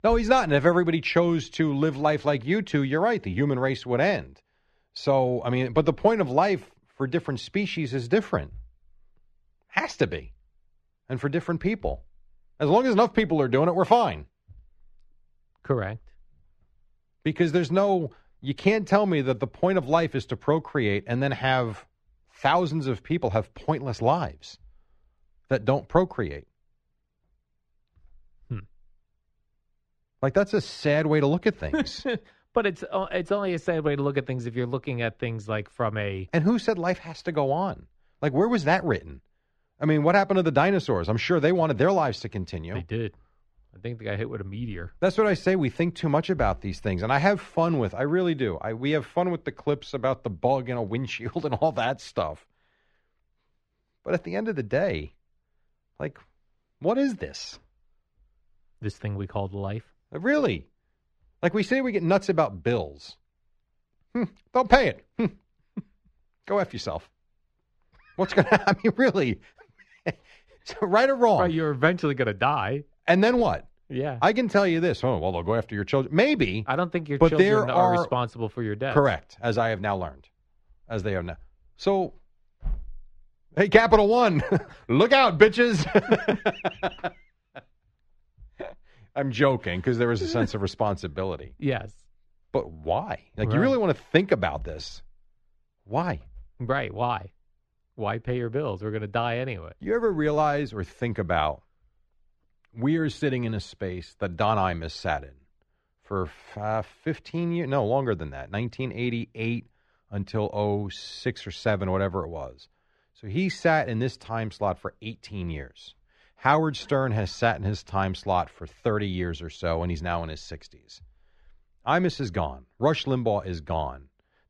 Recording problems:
muffled; slightly; fading above 3 kHz

